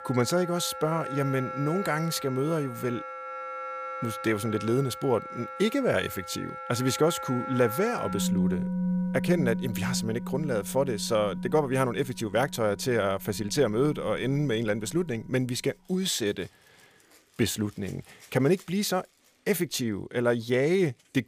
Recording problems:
background music; loud; throughout; 7 dB below the speech

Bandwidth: 15 kHz